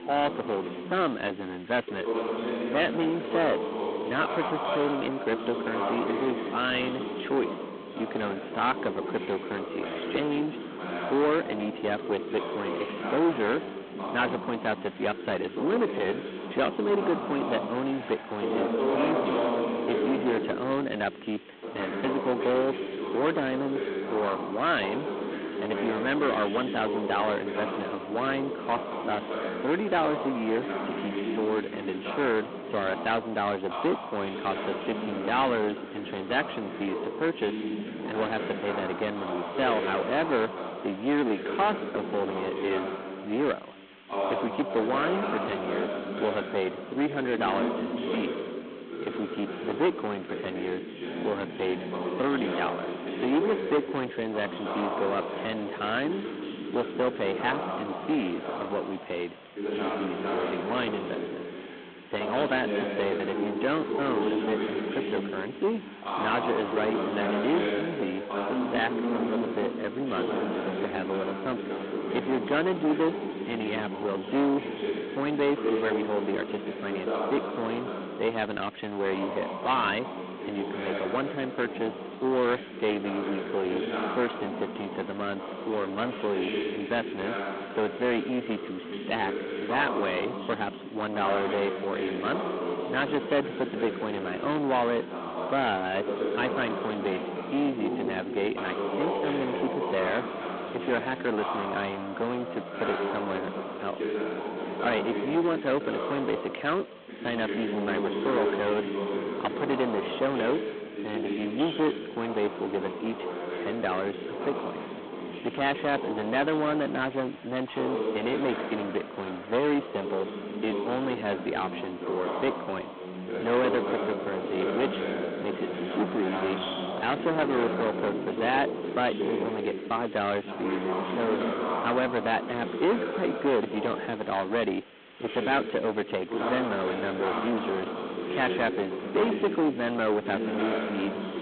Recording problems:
phone-call audio; poor line; nothing above 4 kHz
distortion; heavy; 9 dB below the speech
voice in the background; loud; throughout; 3 dB below the speech
hiss; faint; throughout; 25 dB below the speech

